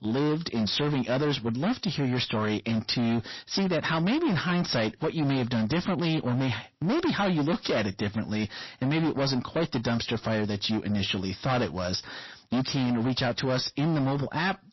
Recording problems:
distortion; heavy; 22% of the sound clipped
garbled, watery; slightly; nothing above 5.5 kHz

